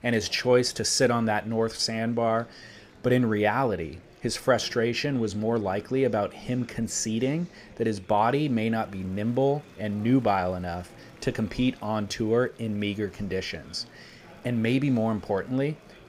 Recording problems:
murmuring crowd; faint; throughout; 25 dB below the speech

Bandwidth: 15.5 kHz